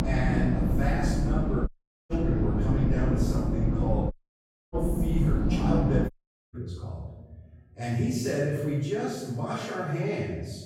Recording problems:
room echo; strong; dies away in 1 s
off-mic speech; far
low rumble; loud; until 6 s; 2 dB below the speech
audio cutting out; at 1.5 s, at 4 s for 0.5 s and at 6 s

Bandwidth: 16 kHz